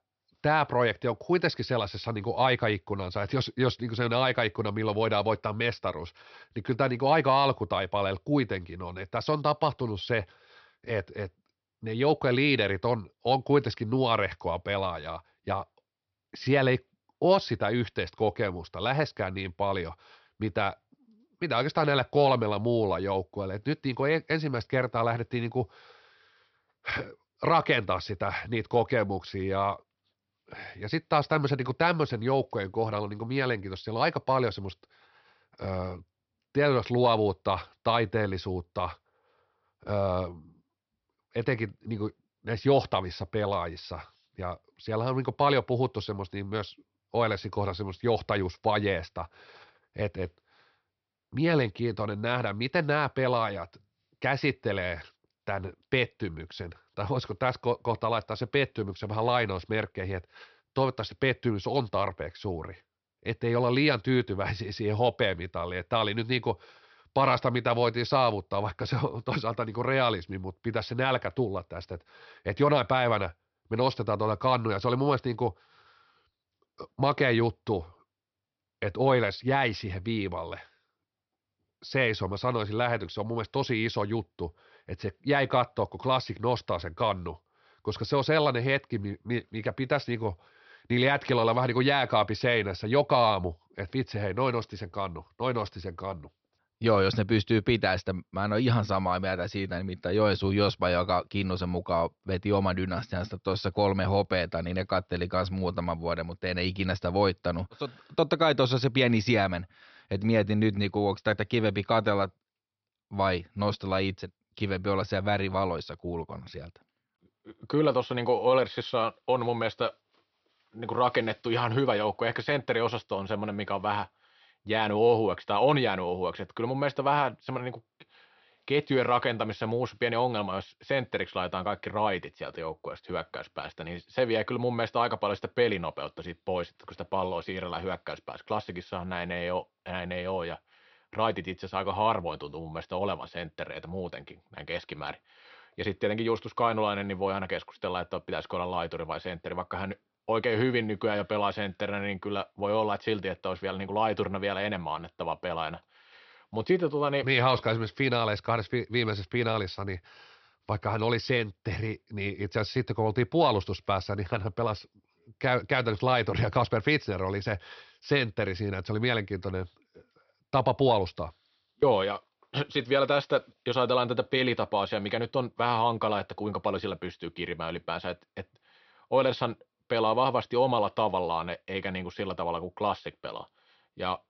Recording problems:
high frequencies cut off; noticeable; nothing above 5.5 kHz

